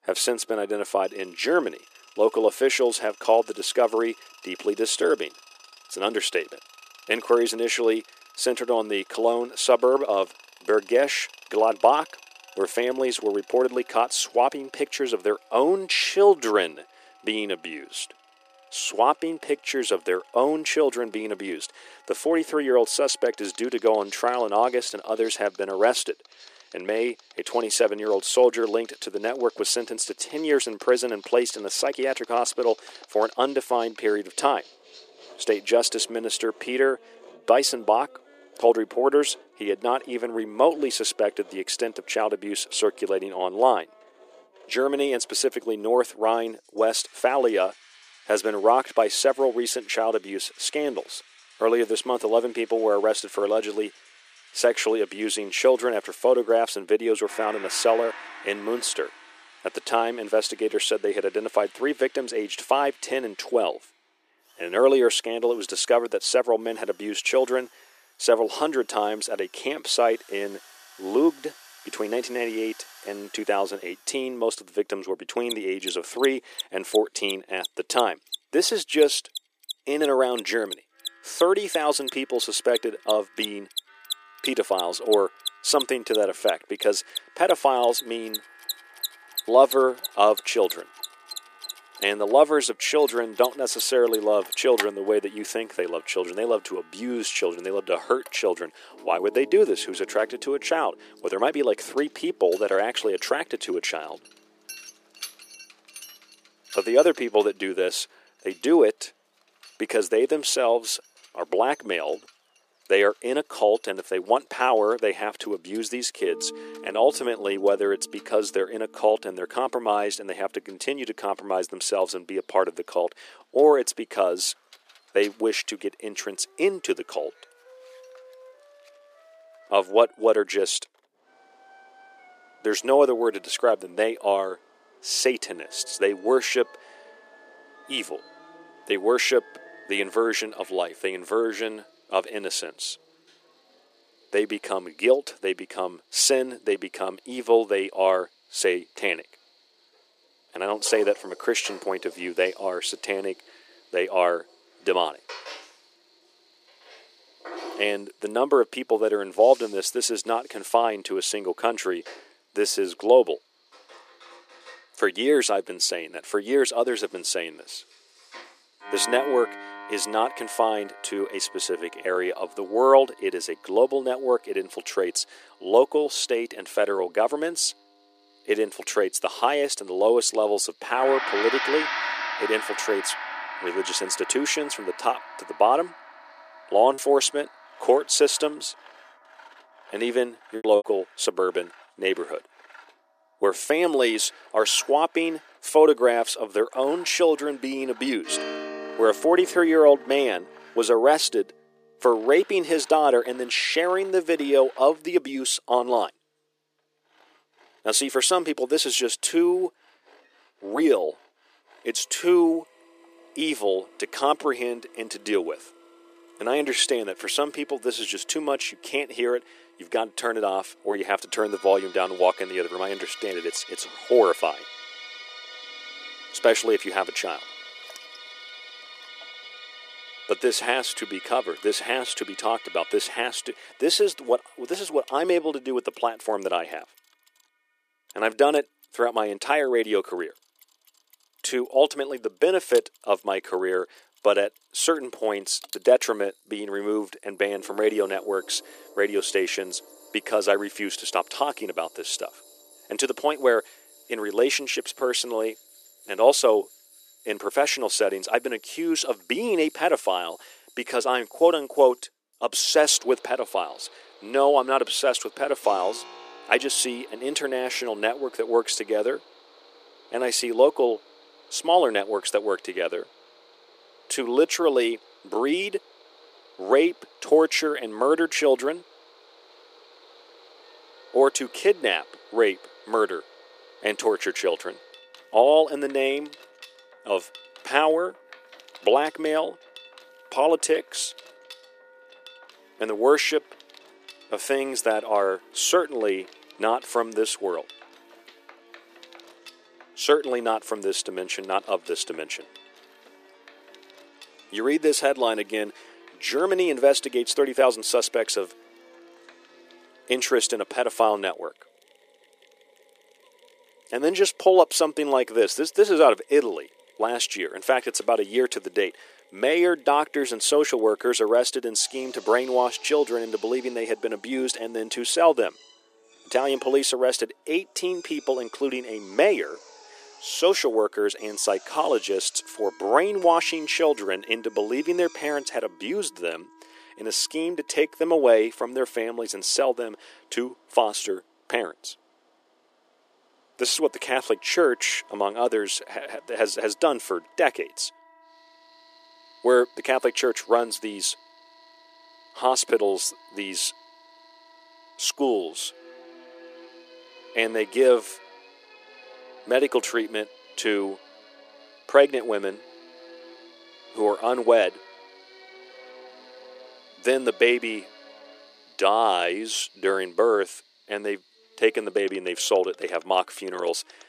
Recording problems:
thin; very; fading below 350 Hz
machinery noise; noticeable; throughout; 20 dB below the speech
background music; noticeable; throughout; 20 dB below the speech
choppy; very; from 3:07 to 3:11; 6% of the speech affected

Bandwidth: 14.5 kHz